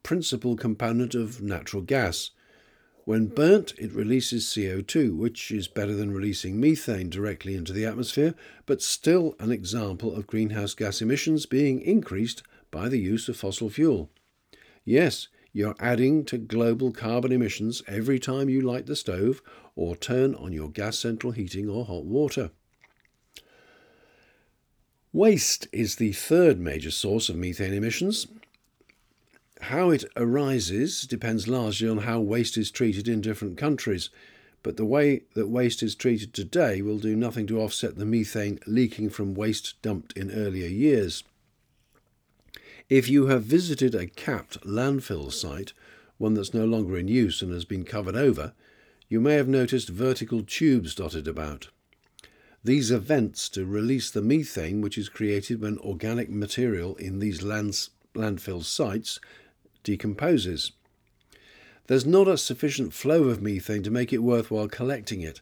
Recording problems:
none

